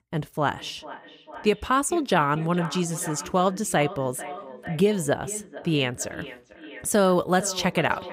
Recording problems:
echo of what is said; noticeable; throughout; 450 ms later, 15 dB below the speech

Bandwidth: 15.5 kHz